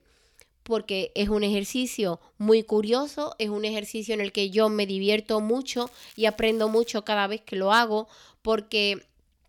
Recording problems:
crackling; faint; from 6 to 7 s; 25 dB below the speech

